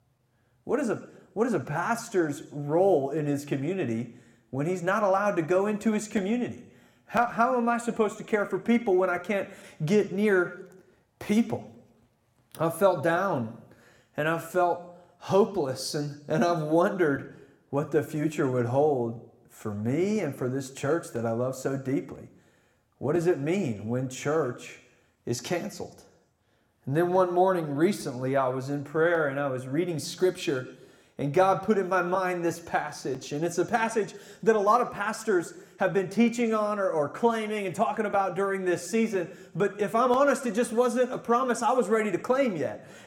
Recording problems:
room echo; very slight; dies away in 0.7 s

